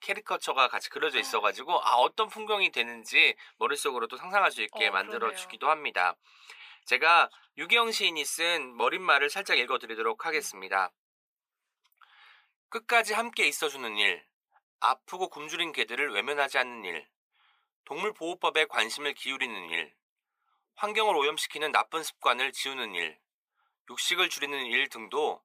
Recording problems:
thin; very; fading below 550 Hz

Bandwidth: 15 kHz